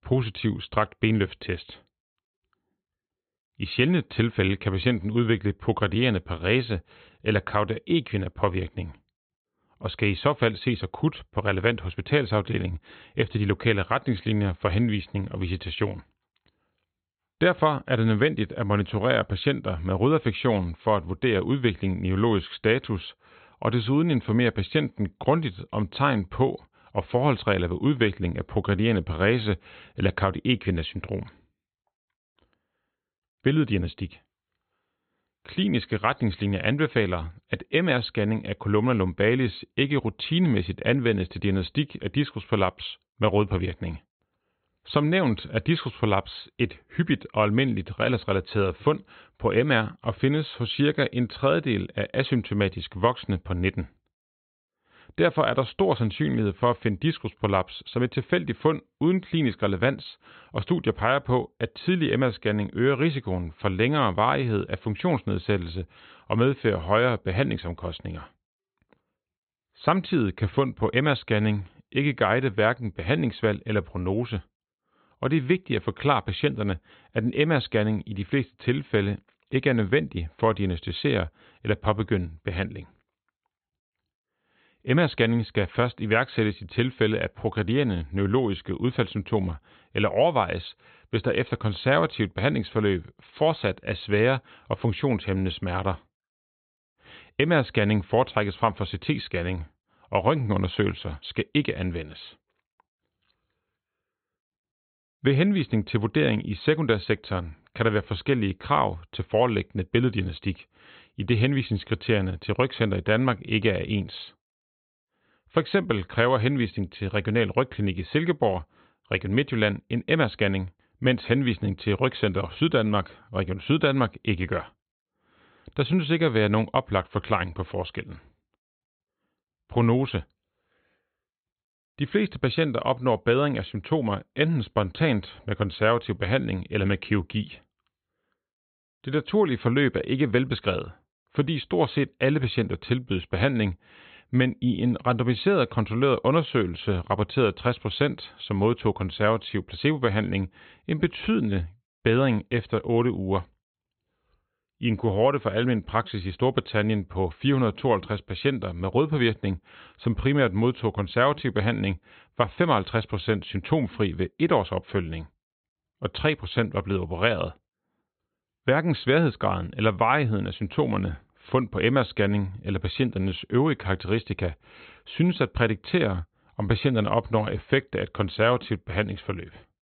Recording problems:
high frequencies cut off; severe; nothing above 4 kHz

